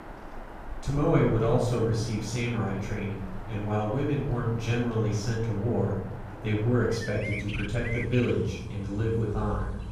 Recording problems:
off-mic speech; far
room echo; noticeable; dies away in 0.9 s
animal sounds; noticeable; throughout; 15 dB below the speech

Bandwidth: 14.5 kHz